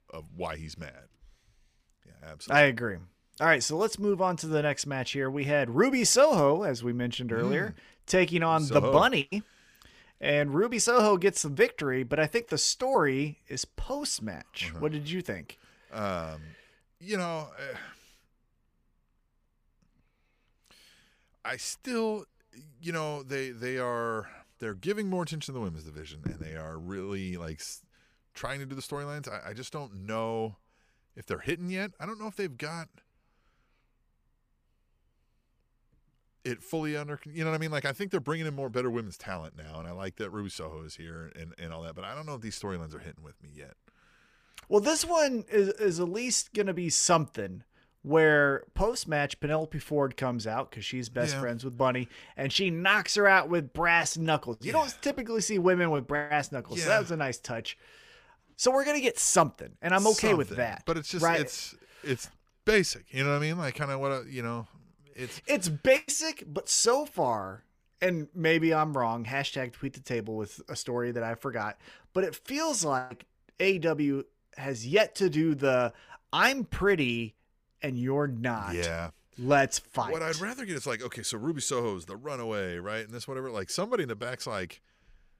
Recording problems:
none

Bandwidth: 15 kHz